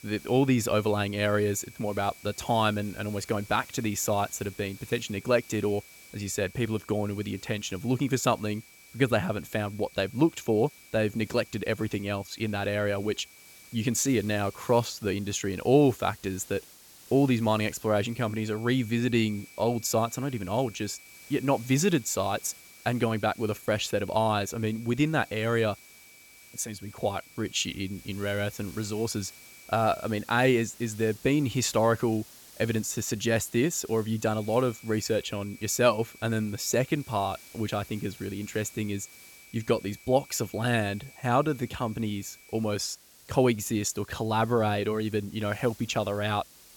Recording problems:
high-pitched whine; faint; until 15 s, from 18 to 30 s and from 34 to 43 s; 2.5 kHz, 25 dB below the speech
hiss; faint; throughout; 20 dB below the speech

